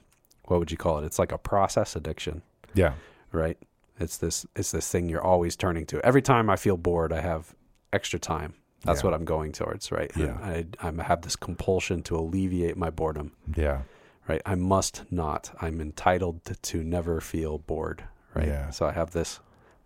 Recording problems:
none

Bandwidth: 16 kHz